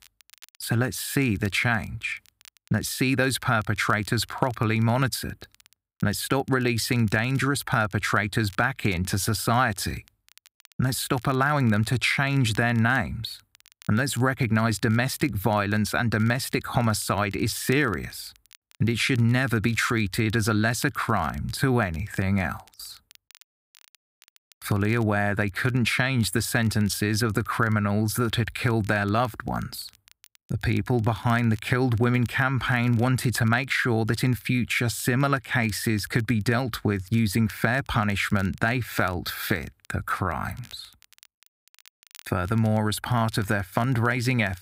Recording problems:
crackle, like an old record; faint; 30 dB below the speech

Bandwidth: 15.5 kHz